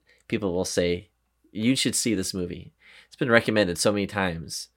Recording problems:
none

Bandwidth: 16.5 kHz